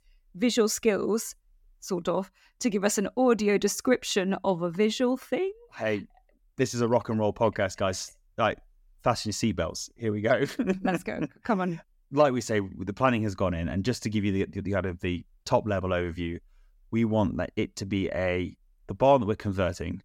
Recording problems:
none

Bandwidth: 17.5 kHz